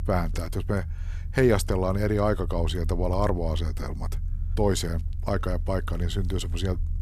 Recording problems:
low rumble; faint; throughout; 25 dB below the speech

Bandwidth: 14 kHz